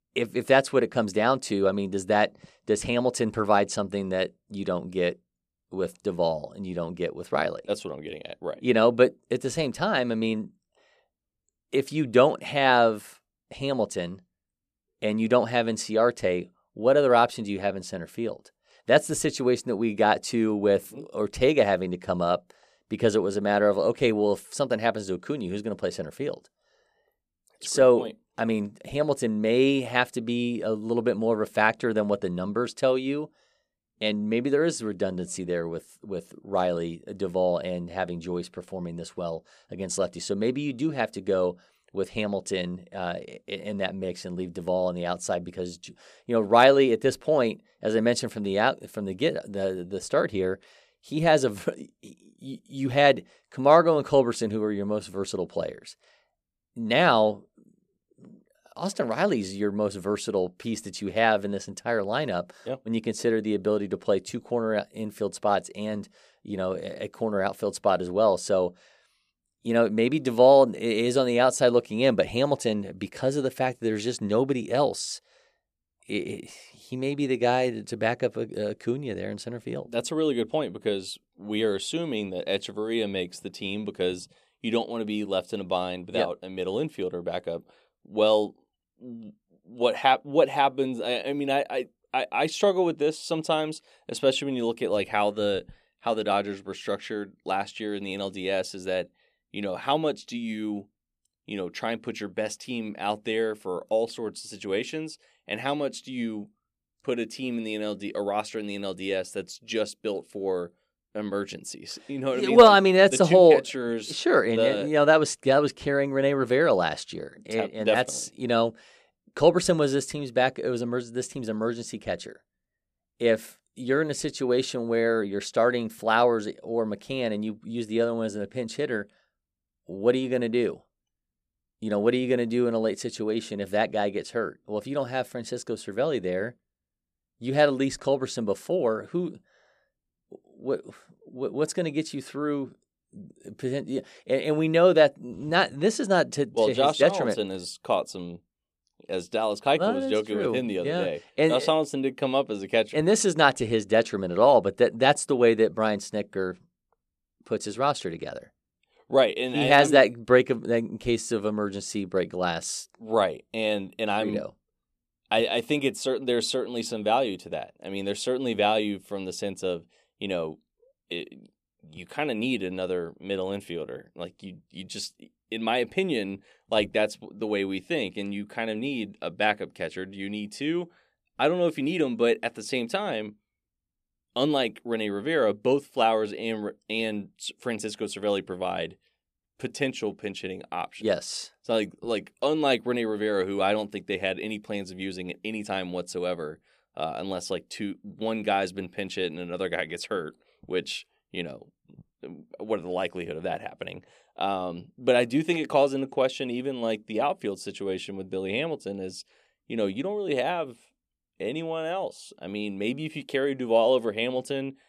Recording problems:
none

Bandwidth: 14.5 kHz